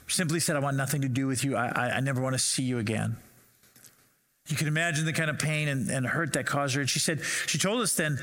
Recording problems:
squashed, flat; heavily

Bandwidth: 16.5 kHz